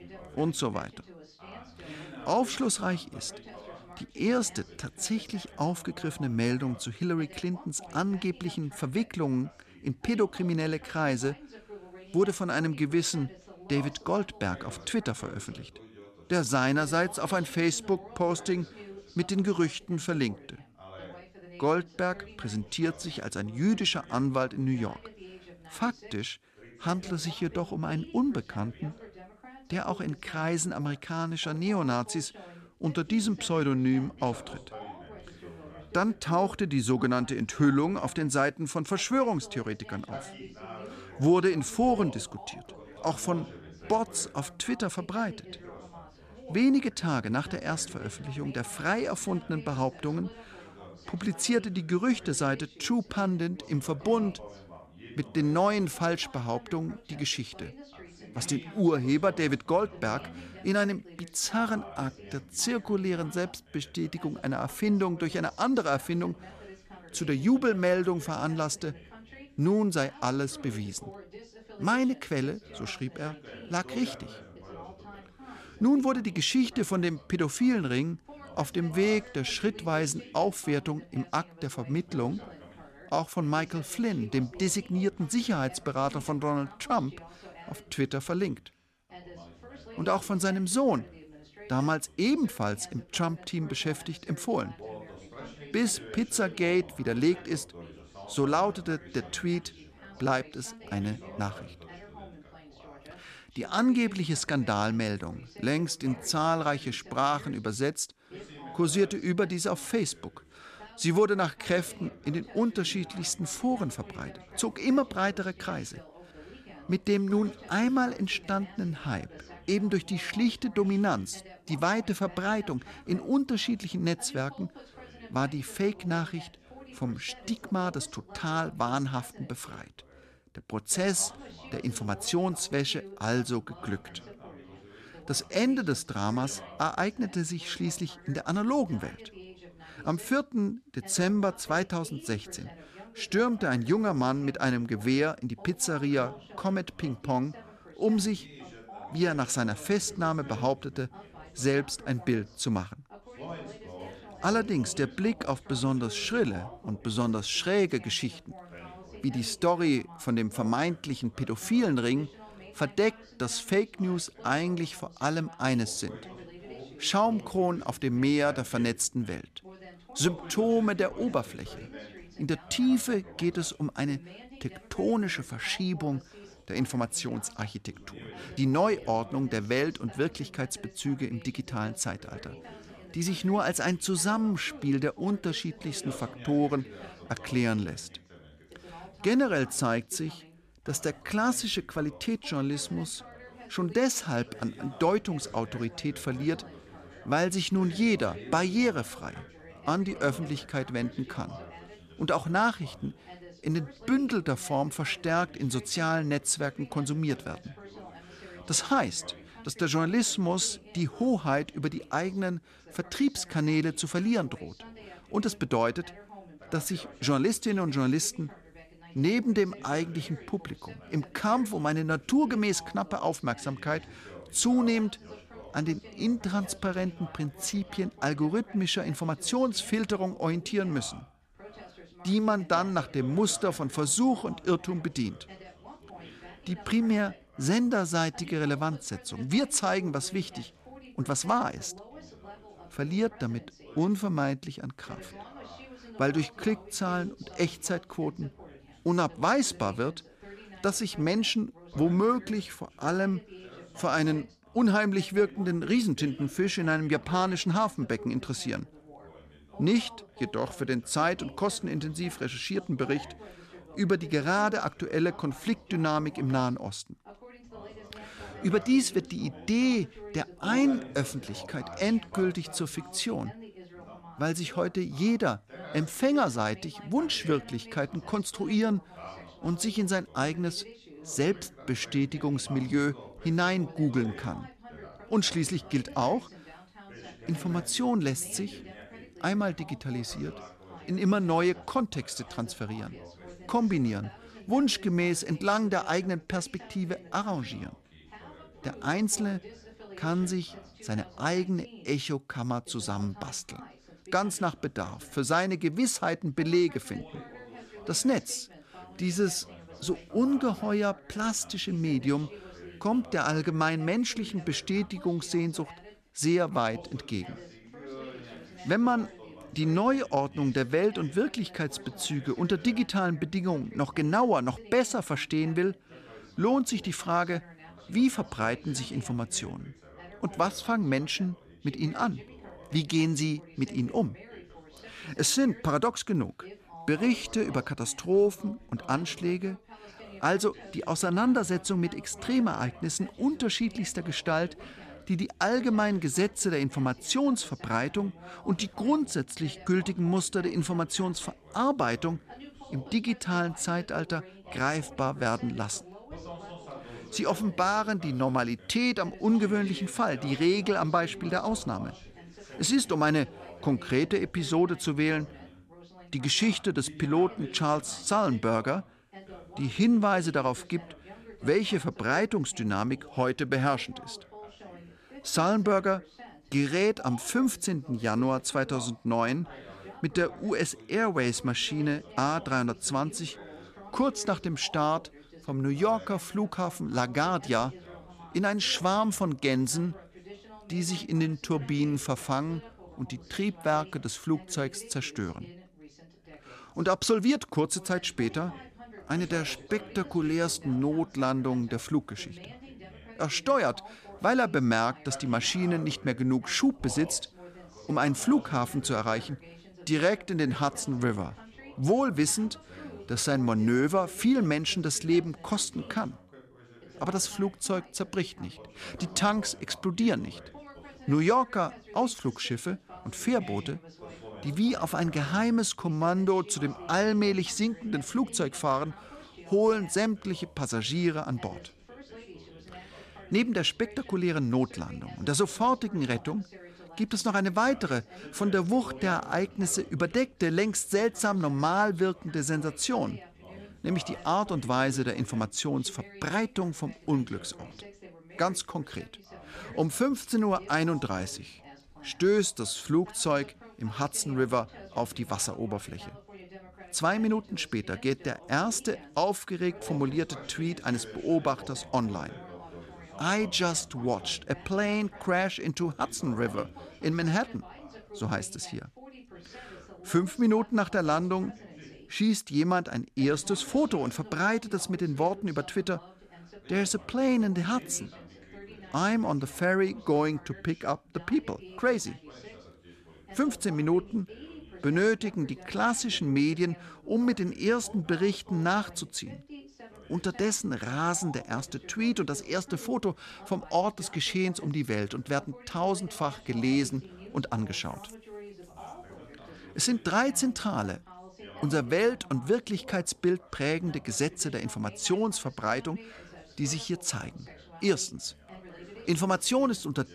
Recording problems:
background chatter; noticeable; throughout; 2 voices, 20 dB below the speech

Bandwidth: 14.5 kHz